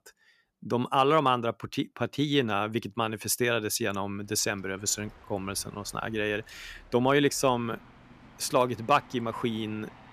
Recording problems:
train or aircraft noise; faint; from 4.5 s on; 25 dB below the speech

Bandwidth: 14.5 kHz